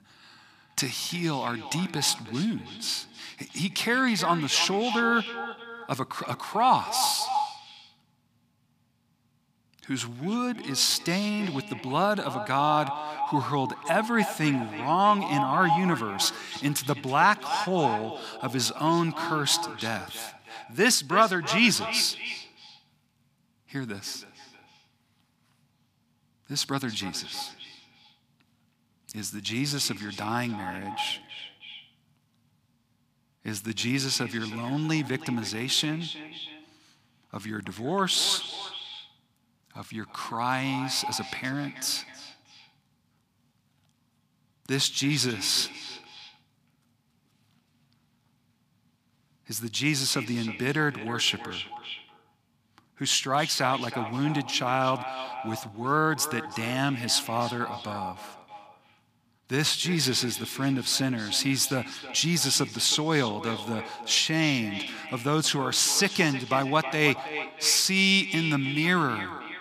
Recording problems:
echo of what is said; strong; throughout; 320 ms later, 10 dB below the speech

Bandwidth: 15 kHz